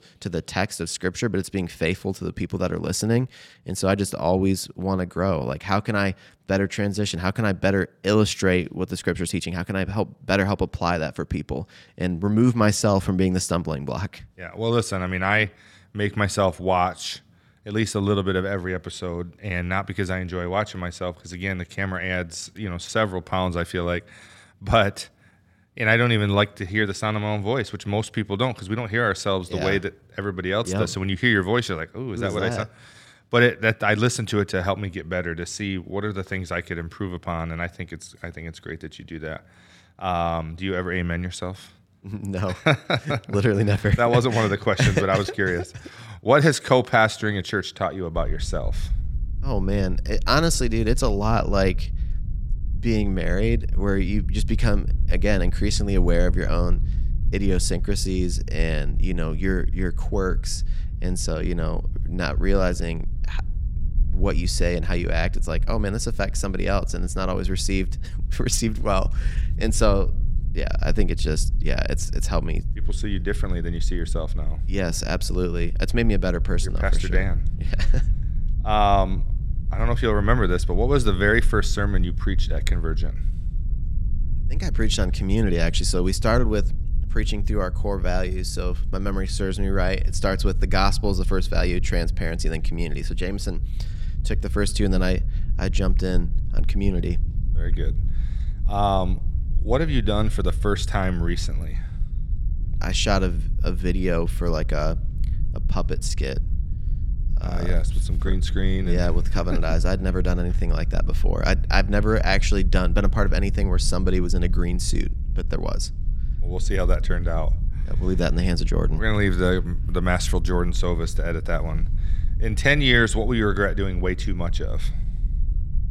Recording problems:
low rumble; faint; from 48 s on; 20 dB below the speech

